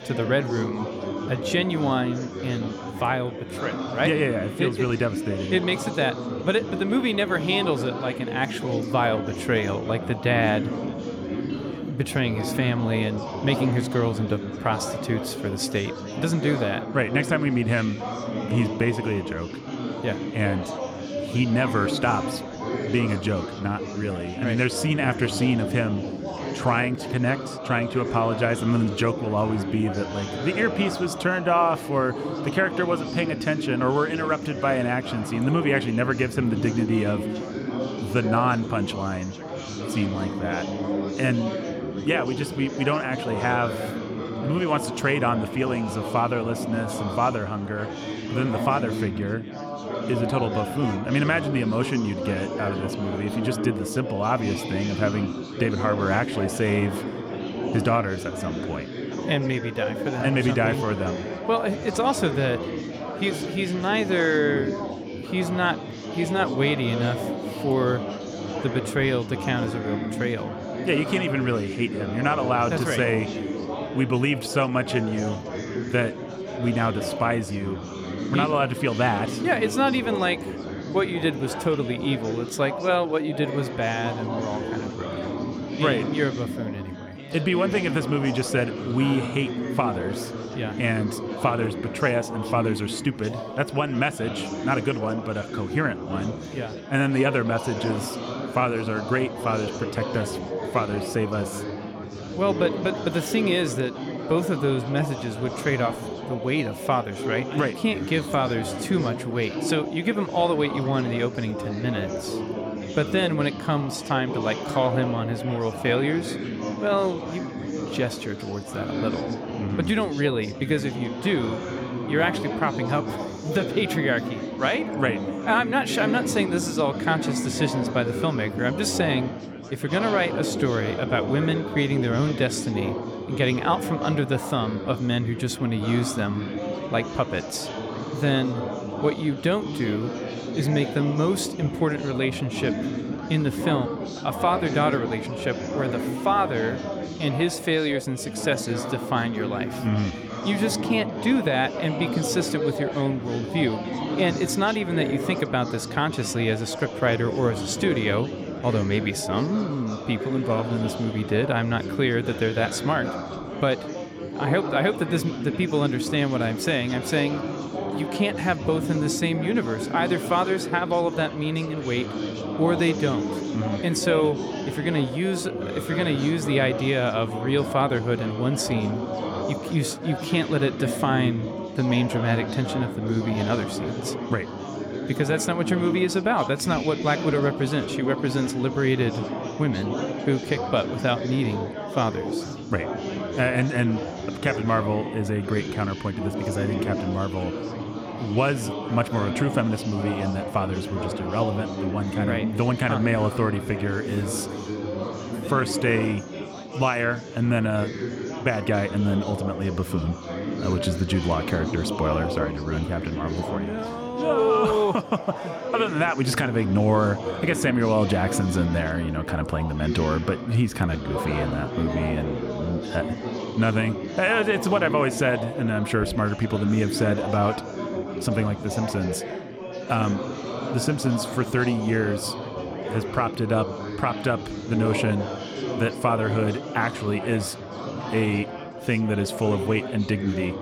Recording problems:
chatter from many people; loud; throughout; 5 dB below the speech

